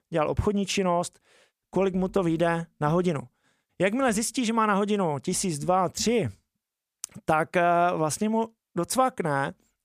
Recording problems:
none

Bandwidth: 15 kHz